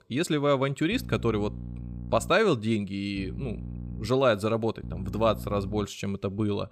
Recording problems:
electrical hum; faint; from 1 to 2.5 s, at 3 s and from 5 to 6 s; 60 Hz, 20 dB below the speech

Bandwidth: 15.5 kHz